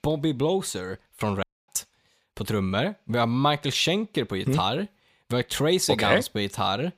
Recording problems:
audio cutting out; at 1.5 s

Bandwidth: 15 kHz